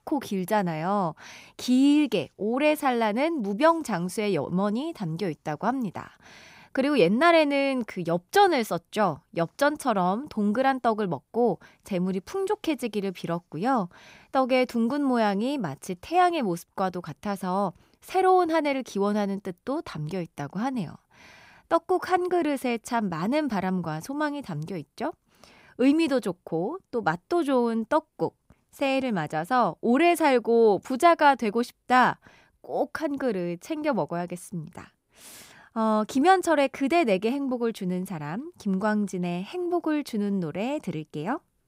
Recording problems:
none

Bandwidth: 15.5 kHz